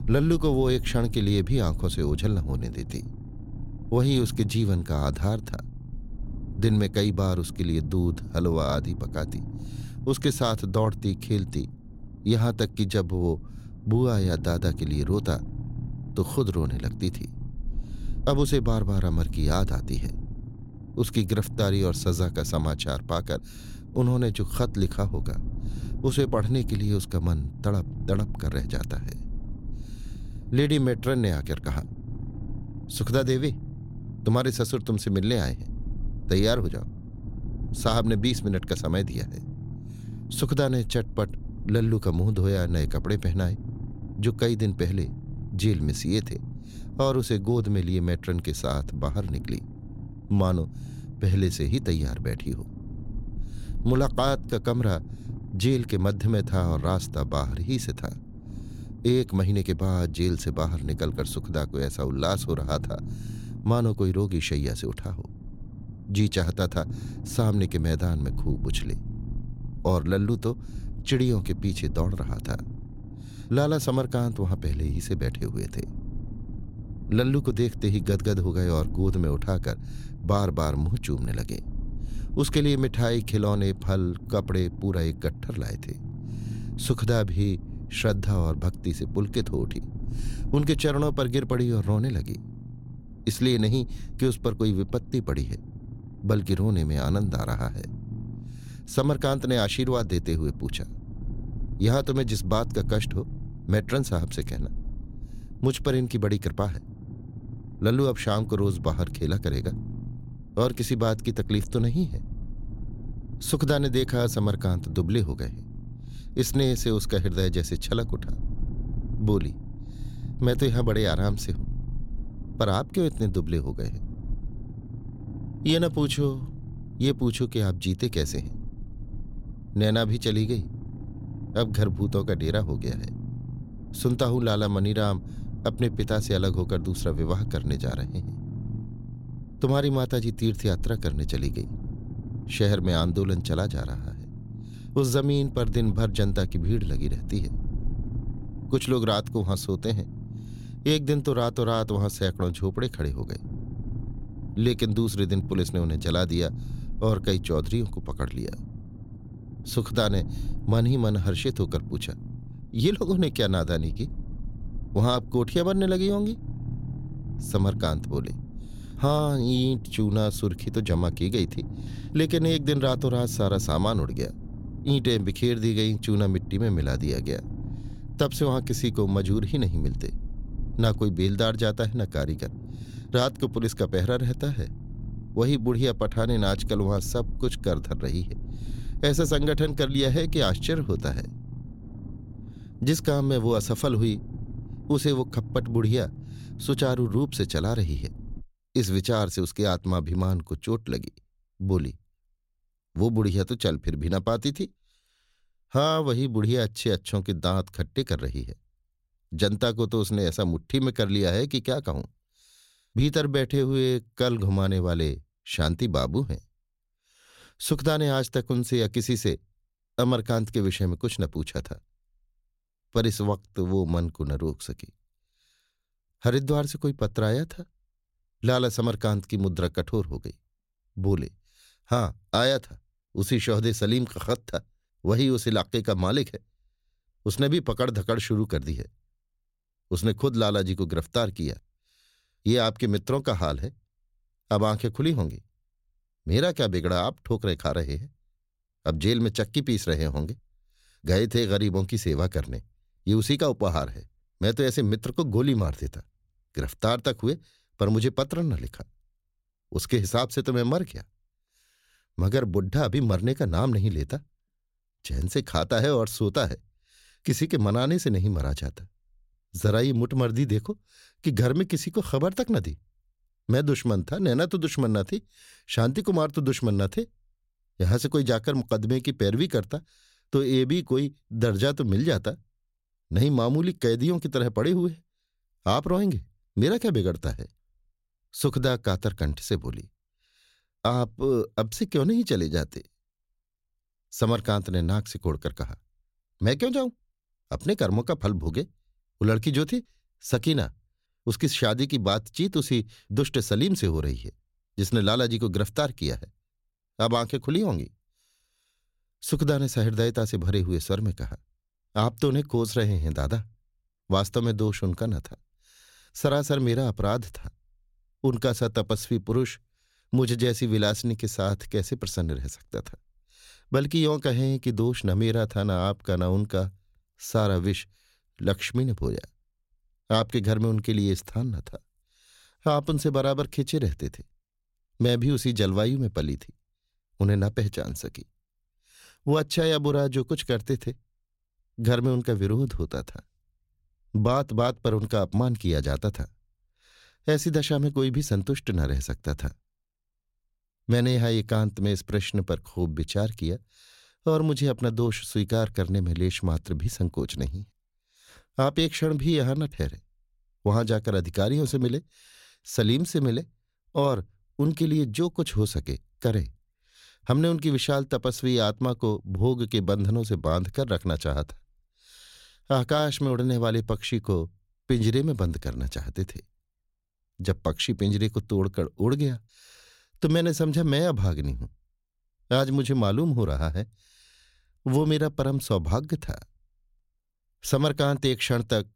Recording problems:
low rumble; noticeable; until 3:18; 20 dB below the speech

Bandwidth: 16.5 kHz